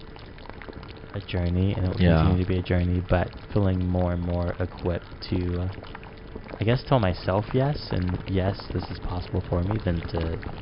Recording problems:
high frequencies cut off; noticeable; nothing above 5.5 kHz
household noises; noticeable; throughout; 15 dB below the speech

